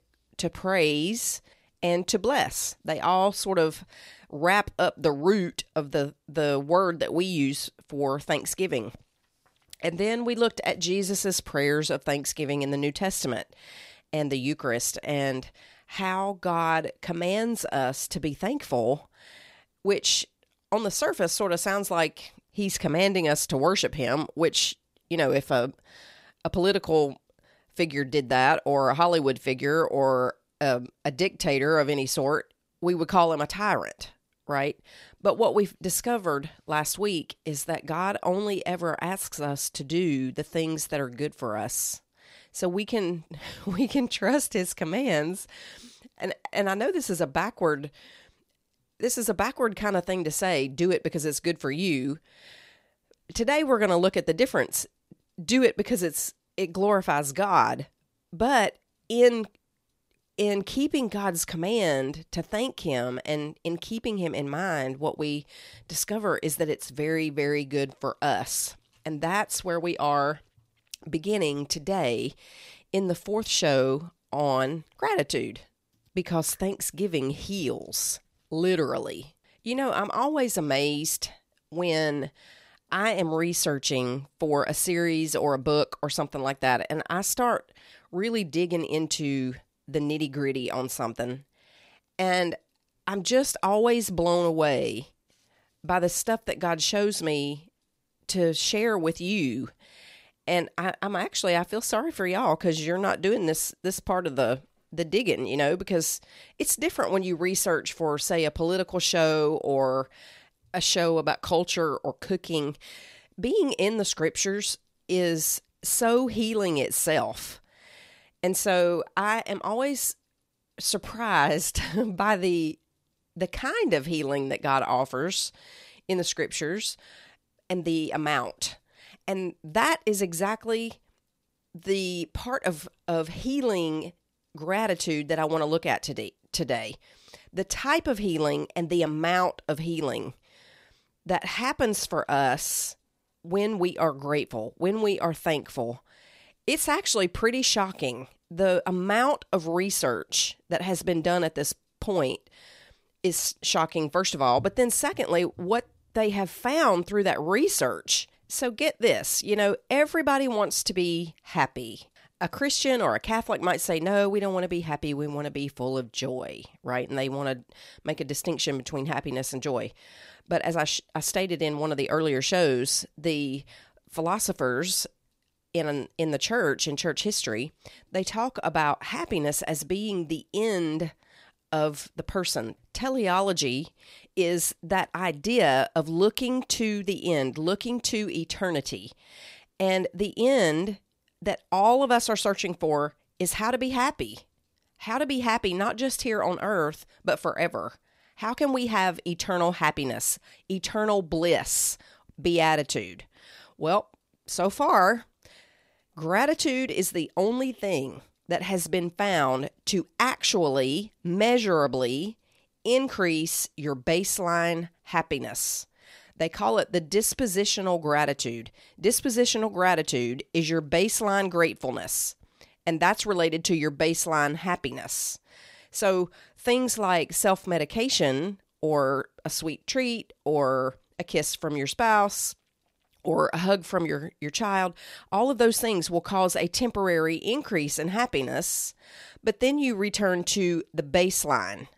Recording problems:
none

